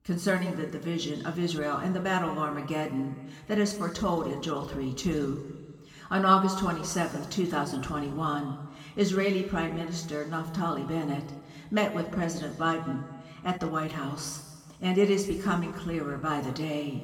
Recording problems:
room echo; noticeable; dies away in 1.4 s
off-mic speech; somewhat distant

